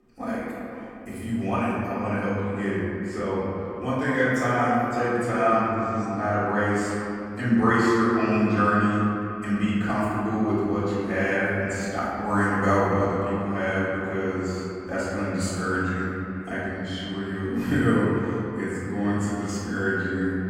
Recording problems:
room echo; strong; dies away in 2.7 s
off-mic speech; far
echo of what is said; faint; throughout; 470 ms later, 20 dB below the speech

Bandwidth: 17.5 kHz